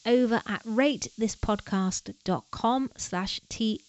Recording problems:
high frequencies cut off; noticeable; nothing above 7.5 kHz
hiss; faint; throughout; 30 dB below the speech

